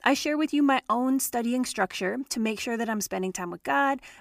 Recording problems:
none

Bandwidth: 15 kHz